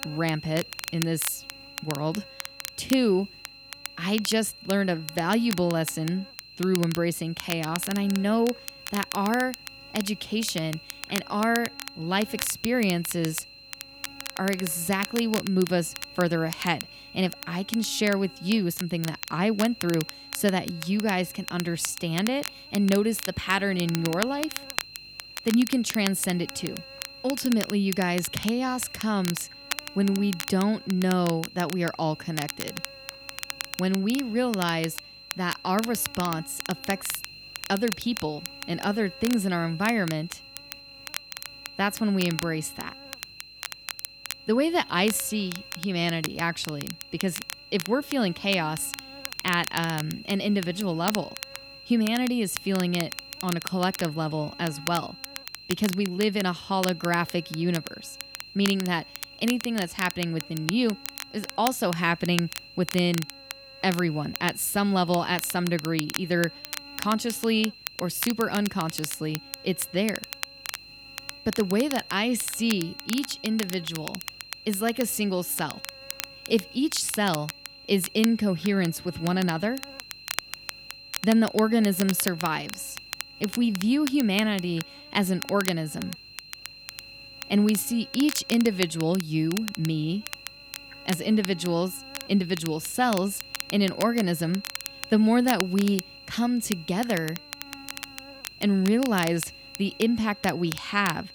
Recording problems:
electrical hum; noticeable; throughout; 50 Hz, 20 dB below the speech
high-pitched whine; noticeable; throughout; 4 kHz, 20 dB below the speech
crackle, like an old record; noticeable; 10 dB below the speech

